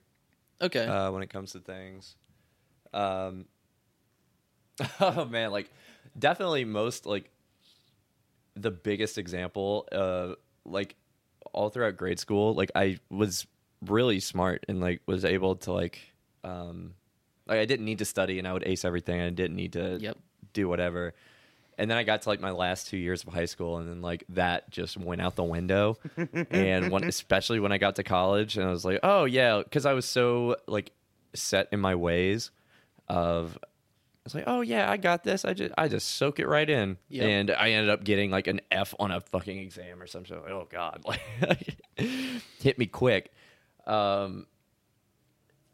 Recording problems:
none

